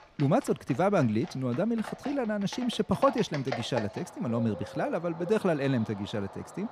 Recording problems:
animal sounds; noticeable; throughout; 15 dB below the speech

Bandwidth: 15 kHz